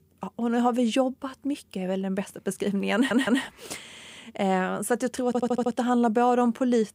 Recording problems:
audio stuttering; at 3 s, at 4 s and at 5.5 s

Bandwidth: 15.5 kHz